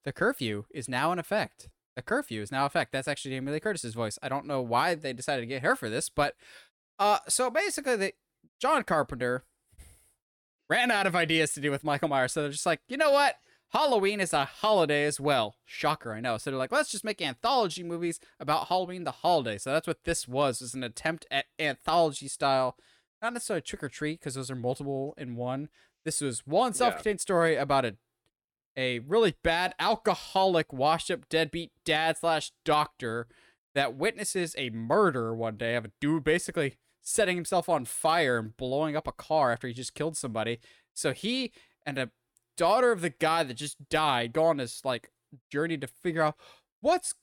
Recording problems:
none

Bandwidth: 17.5 kHz